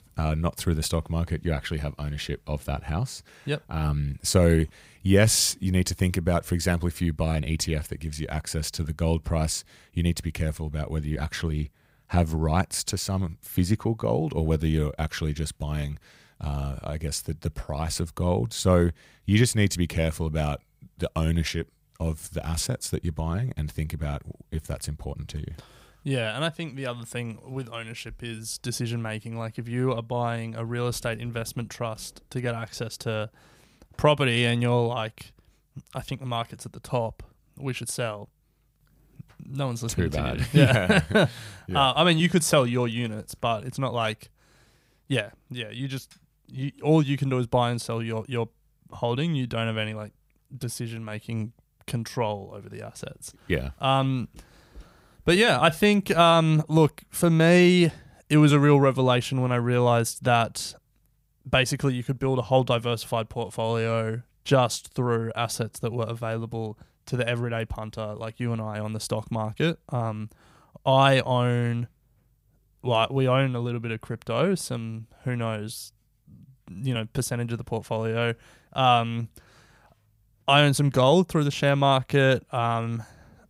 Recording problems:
none

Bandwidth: 15.5 kHz